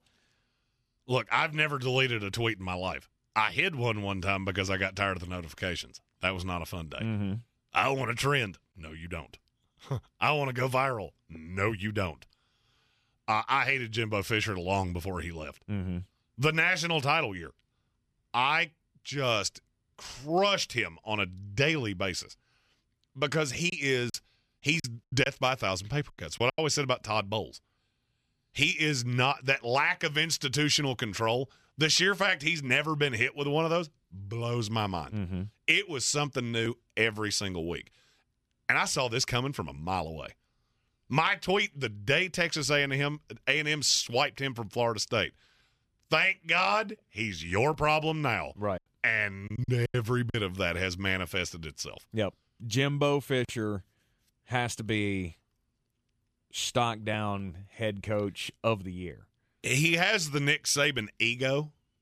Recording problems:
choppy; very; from 24 to 27 s and from 49 to 50 s; 10% of the speech affected

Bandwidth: 14.5 kHz